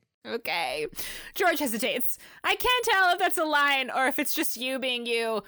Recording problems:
none

